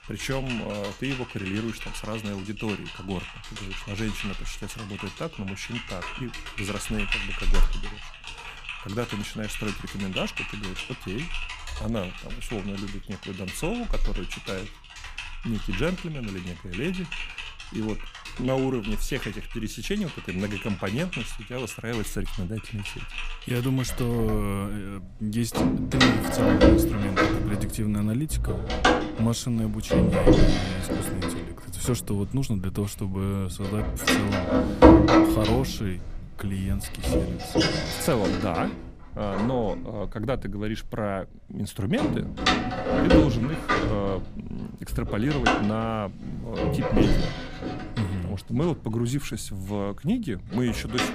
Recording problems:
household noises; very loud; throughout; 4 dB above the speech

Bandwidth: 15 kHz